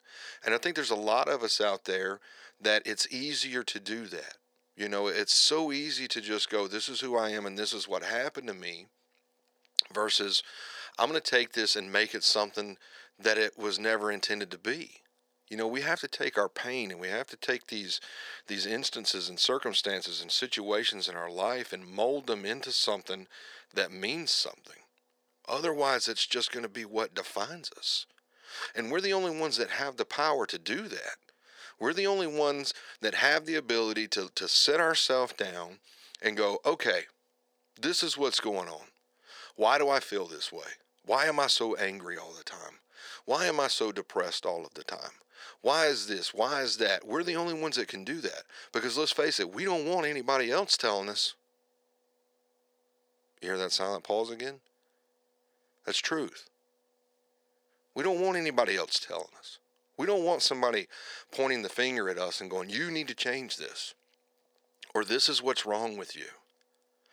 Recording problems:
thin; very; fading below 450 Hz

